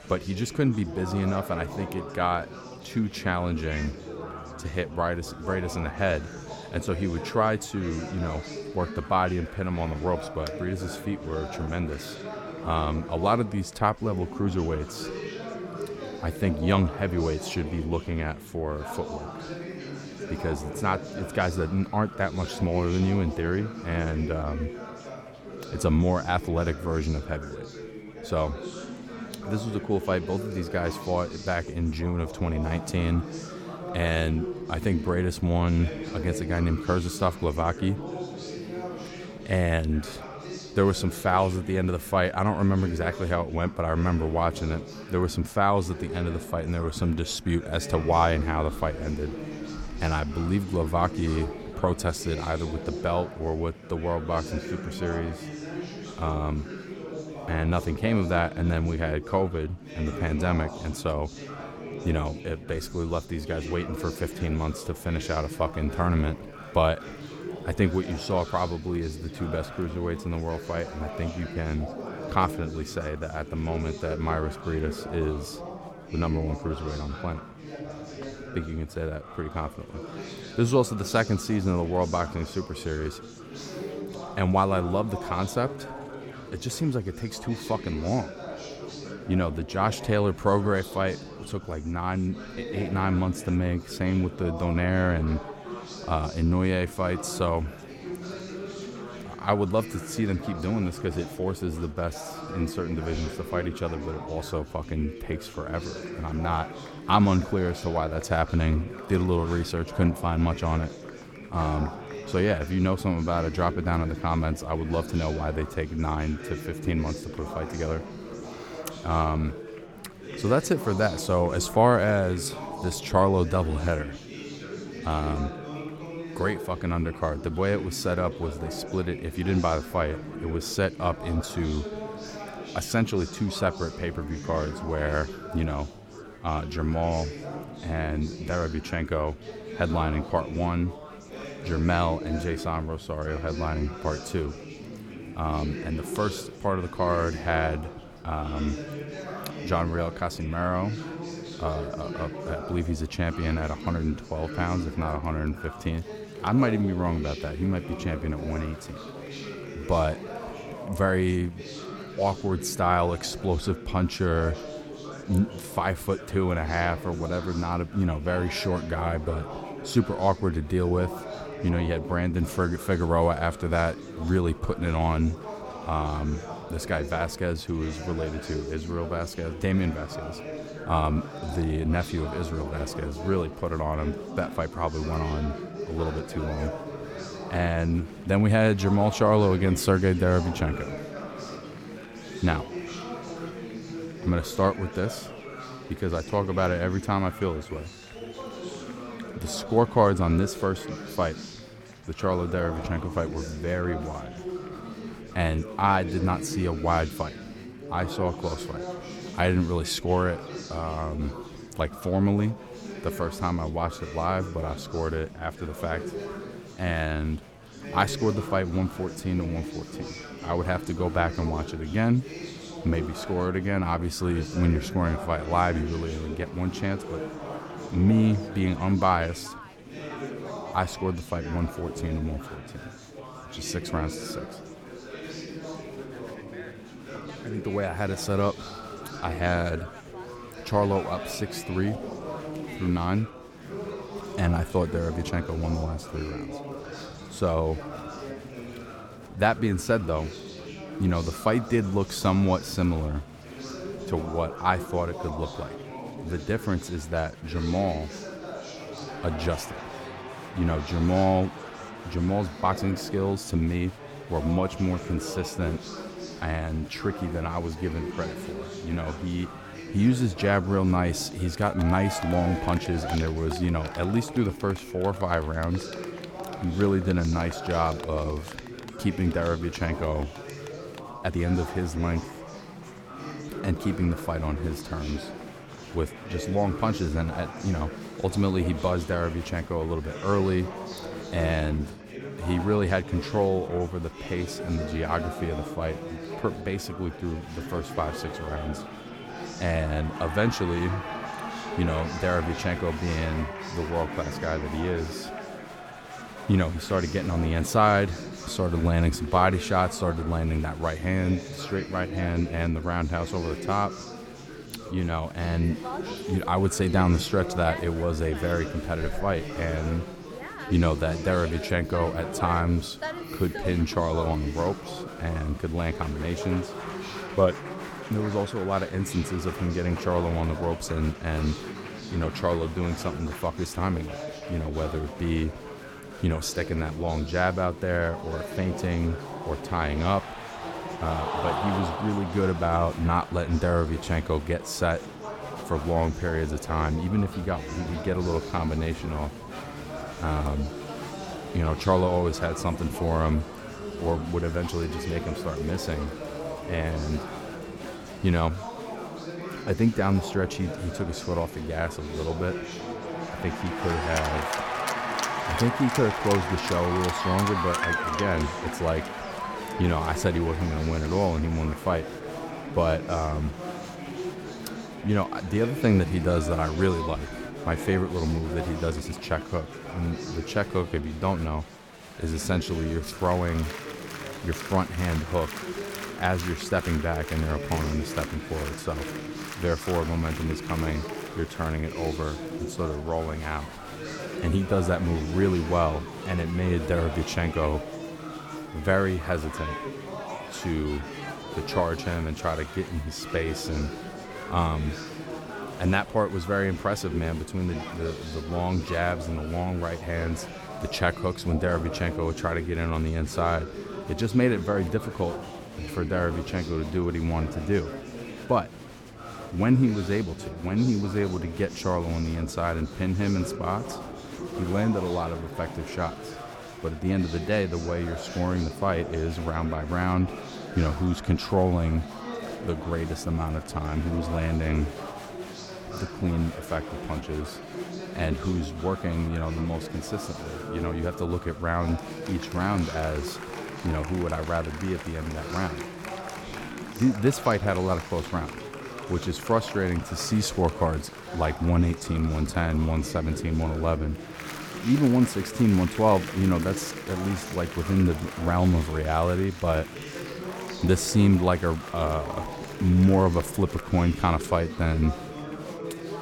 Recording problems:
chatter from many people; loud; throughout; 10 dB below the speech
uneven, jittery; slightly; from 3:19 to 6:19

